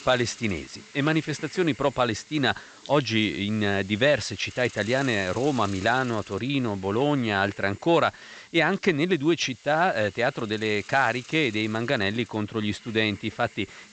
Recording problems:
high frequencies cut off; noticeable; nothing above 8 kHz
hiss; faint; throughout; 20 dB below the speech

